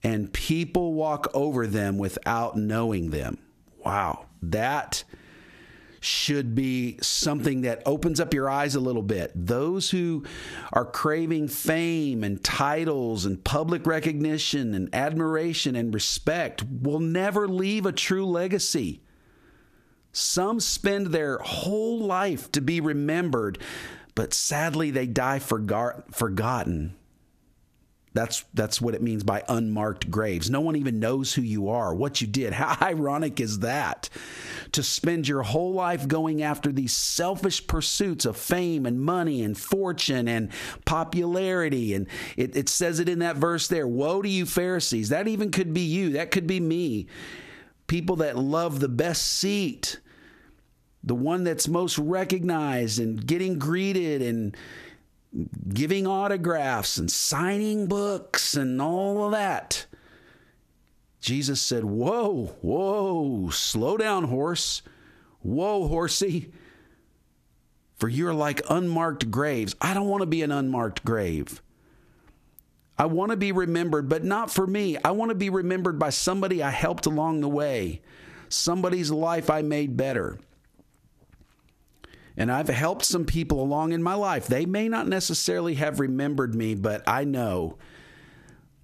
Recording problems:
squashed, flat; heavily

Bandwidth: 14.5 kHz